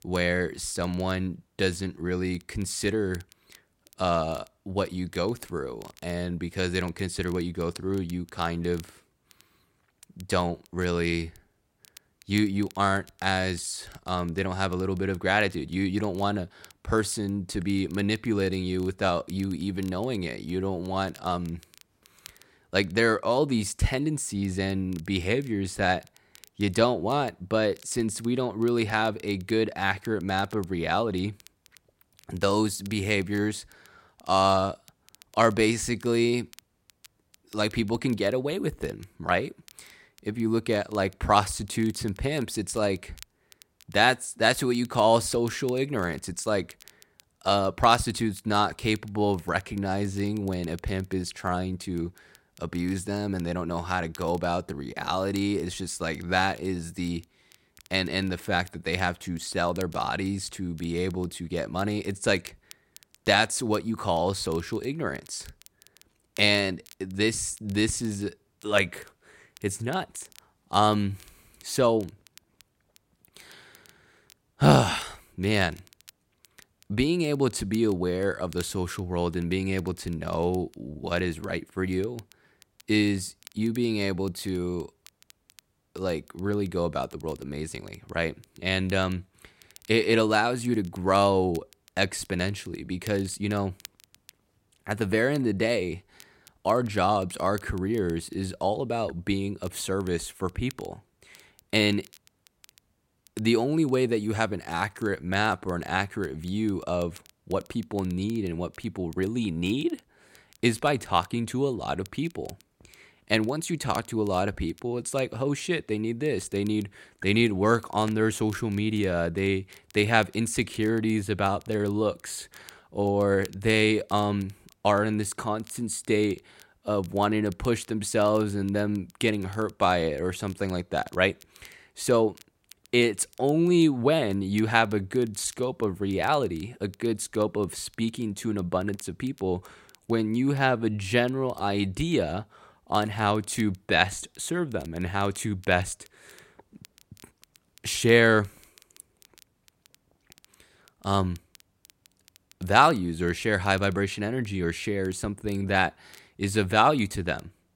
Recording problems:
crackle, like an old record; faint; 25 dB below the speech

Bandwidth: 16 kHz